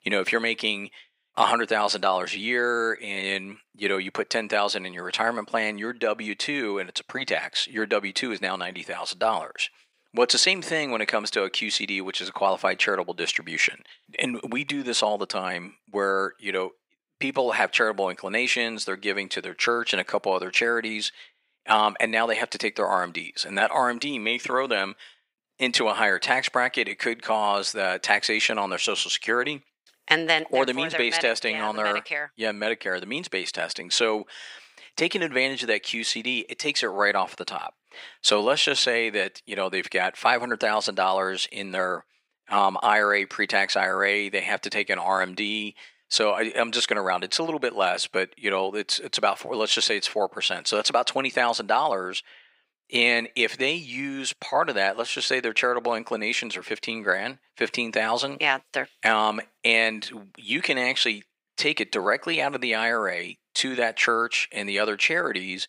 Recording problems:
thin; very; fading below 550 Hz

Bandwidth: 15.5 kHz